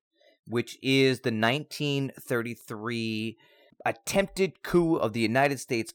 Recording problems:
none

